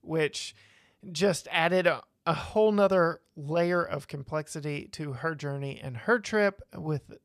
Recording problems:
none

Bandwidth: 14.5 kHz